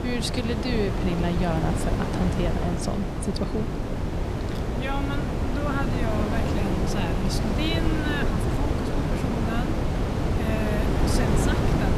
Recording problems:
wind noise on the microphone; heavy; 1 dB above the speech

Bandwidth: 15 kHz